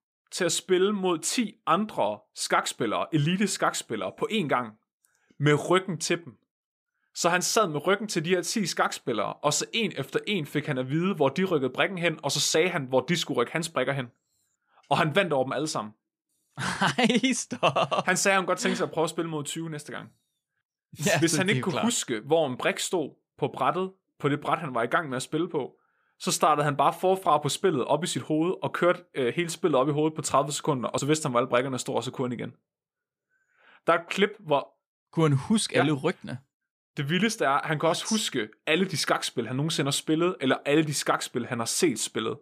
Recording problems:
none

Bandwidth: 15 kHz